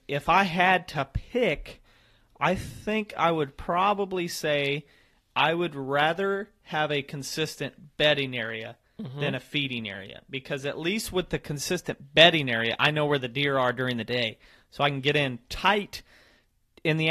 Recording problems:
garbled, watery; slightly; nothing above 14.5 kHz
abrupt cut into speech; at the end

